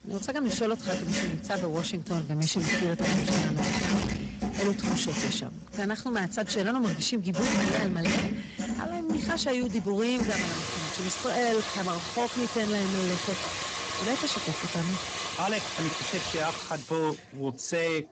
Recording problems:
distortion; heavy; 13% of the sound clipped
garbled, watery; badly; nothing above 7.5 kHz
household noises; loud; throughout; 1 dB below the speech

